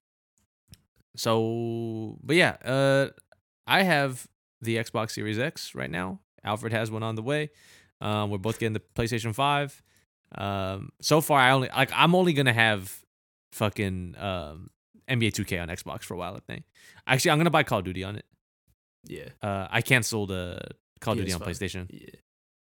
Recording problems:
none

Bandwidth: 17 kHz